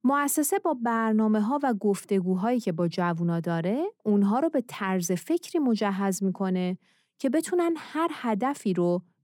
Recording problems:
none

